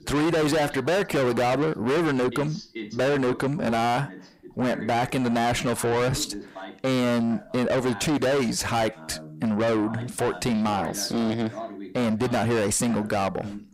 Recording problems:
distortion; heavy; 6 dB below the speech
voice in the background; noticeable; throughout; 15 dB below the speech

